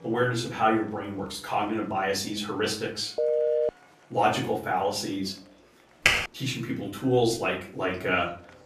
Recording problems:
off-mic speech; far
room echo; slight; dies away in 0.4 s
background music; faint; until 4 s; 25 dB below the speech
murmuring crowd; faint; throughout; 30 dB below the speech
phone ringing; loud; at 3 s; peak 3 dB above the speech
keyboard typing; loud; at 6 s; peak 5 dB above the speech

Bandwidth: 14.5 kHz